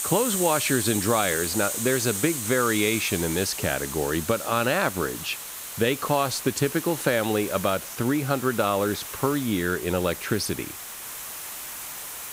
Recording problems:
hiss; loud; throughout; 6 dB below the speech

